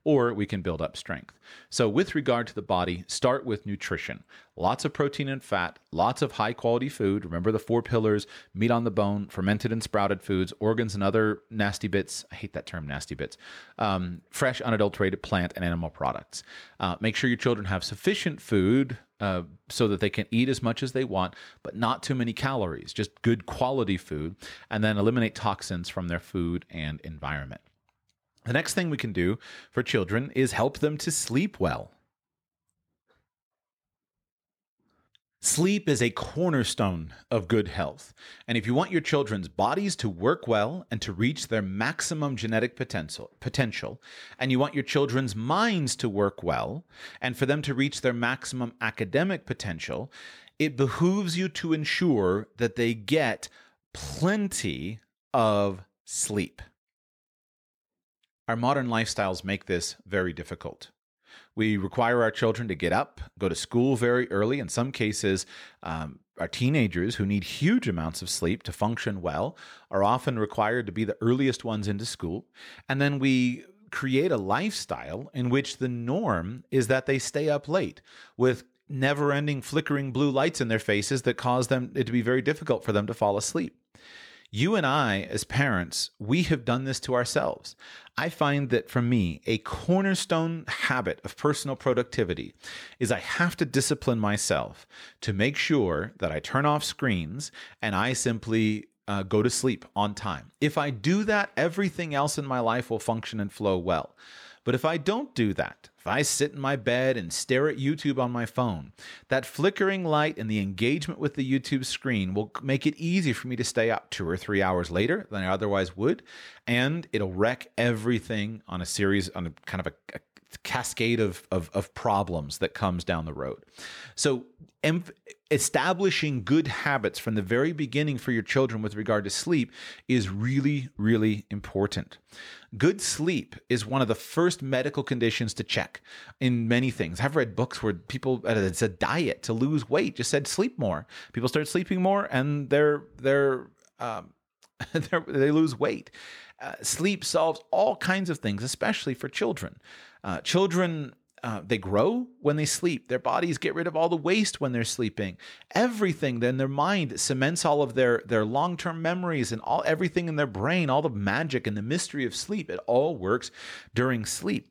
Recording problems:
none

